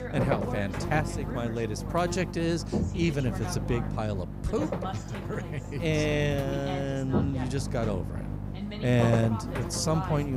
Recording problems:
electrical hum; loud; throughout; 50 Hz, 6 dB below the speech
voice in the background; noticeable; throughout; 10 dB below the speech
abrupt cut into speech; at the end

